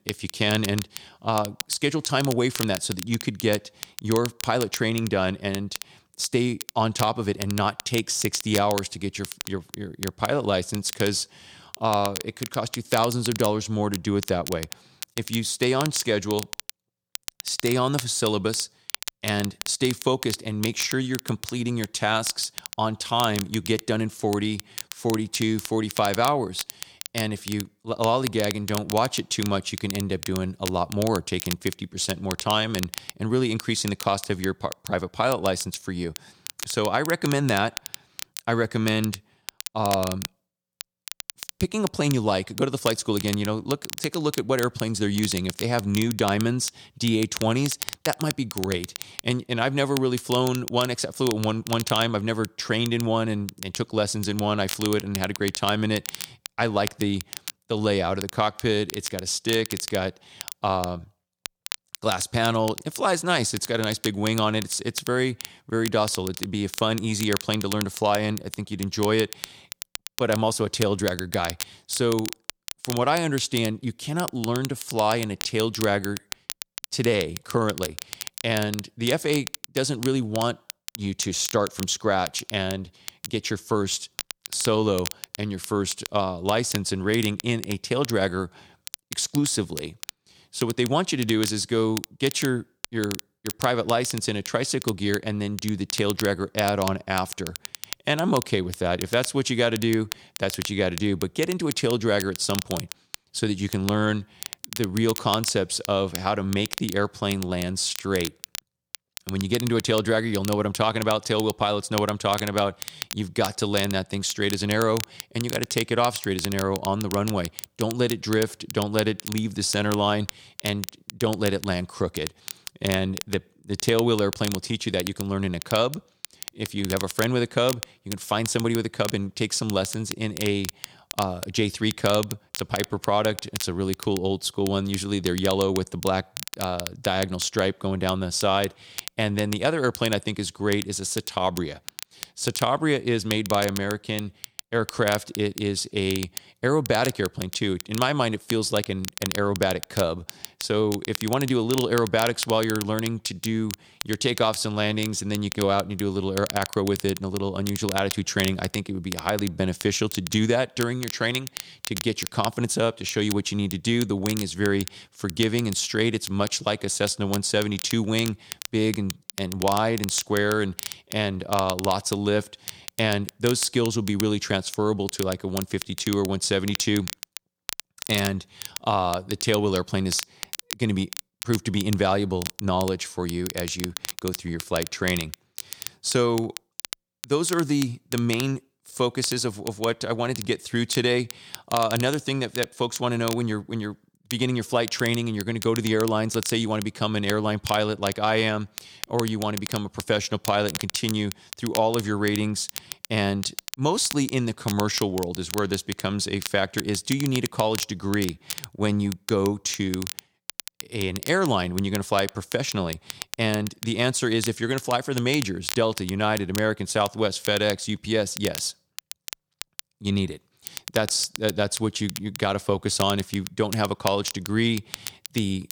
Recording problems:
crackle, like an old record; noticeable; 10 dB below the speech

